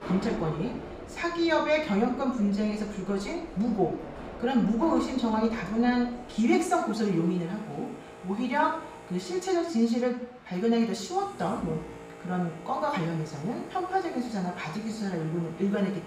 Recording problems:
off-mic speech; far
room echo; noticeable; dies away in 0.6 s
train or aircraft noise; noticeable; throughout; 15 dB below the speech

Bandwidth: 15.5 kHz